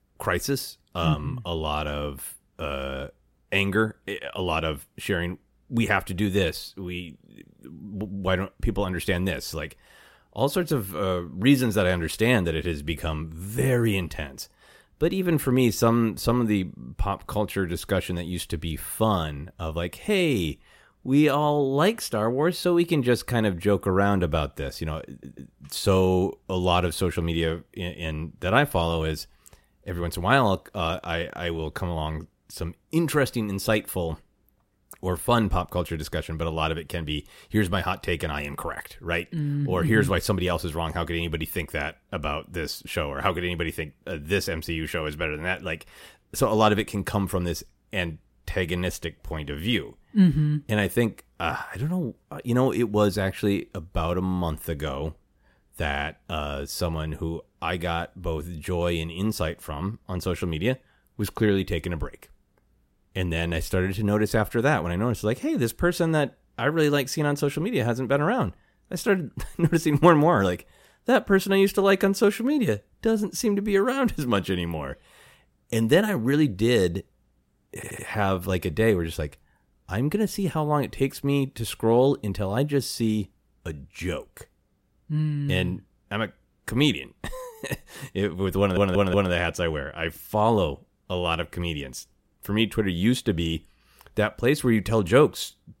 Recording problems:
audio stuttering; at 25 s, at 1:18 and at 1:29

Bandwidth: 16 kHz